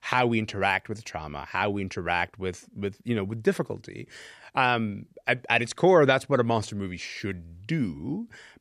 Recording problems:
none

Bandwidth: 14 kHz